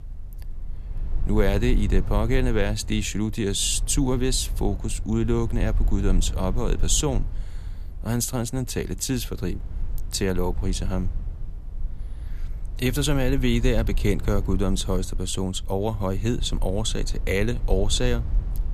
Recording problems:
low rumble; faint; throughout; 20 dB below the speech

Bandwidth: 14.5 kHz